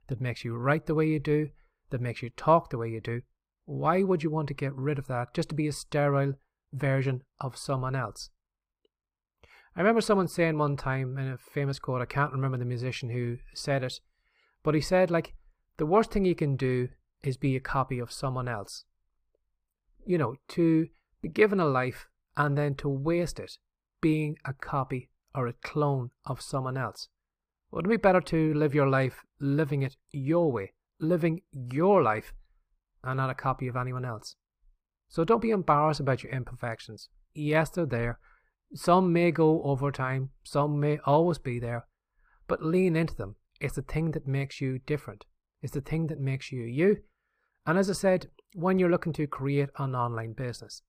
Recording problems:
muffled; slightly; fading above 3.5 kHz

